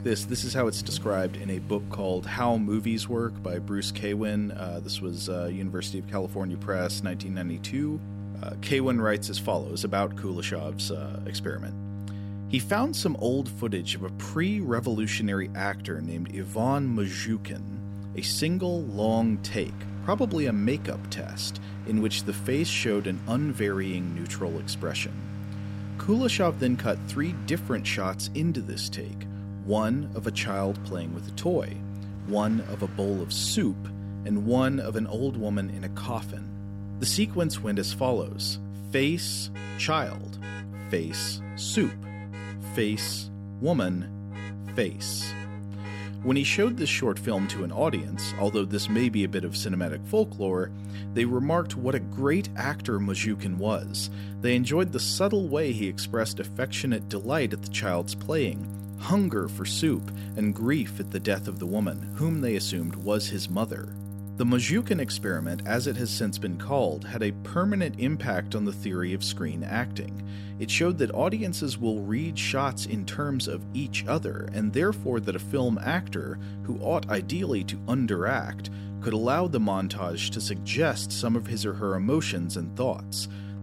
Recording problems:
electrical hum; noticeable; throughout; 50 Hz, 15 dB below the speech
traffic noise; faint; throughout; 20 dB below the speech

